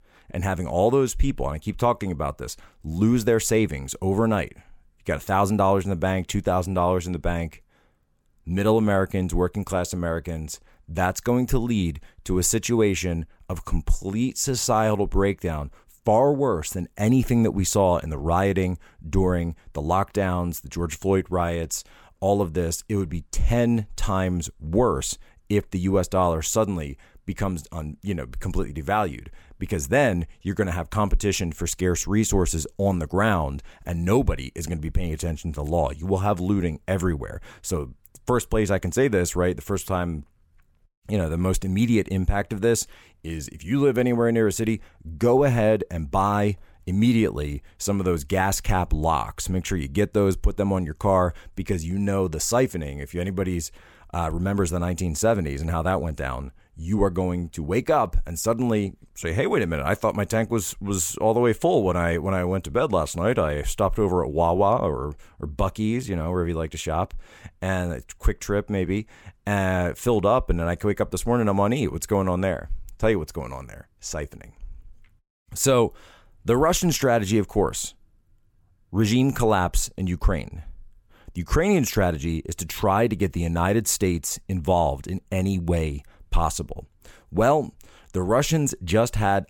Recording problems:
none

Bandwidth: 17 kHz